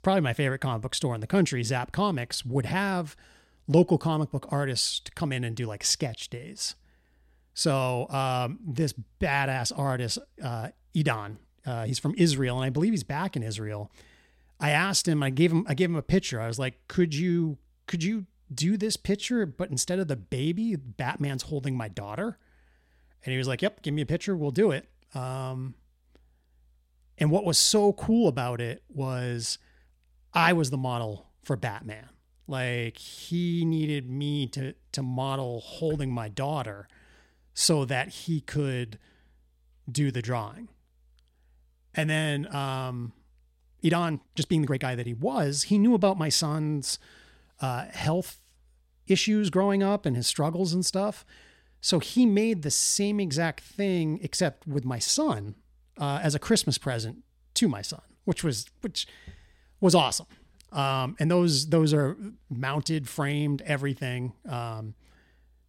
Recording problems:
uneven, jittery; strongly; from 12 to 45 s

